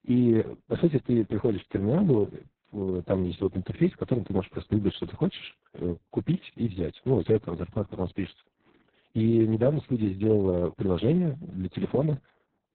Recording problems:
garbled, watery; badly; nothing above 4 kHz

